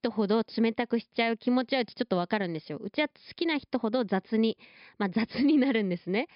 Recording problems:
high frequencies cut off; noticeable; nothing above 5.5 kHz

